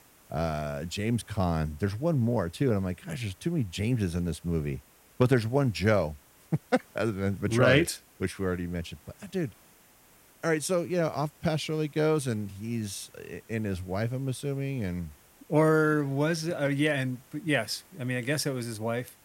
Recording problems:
hiss; faint; throughout; 25 dB below the speech

